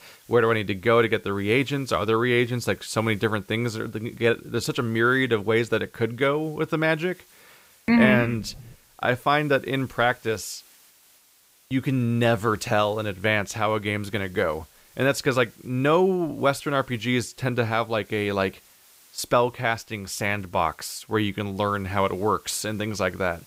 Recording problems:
hiss; faint; throughout; 30 dB below the speech

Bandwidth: 15.5 kHz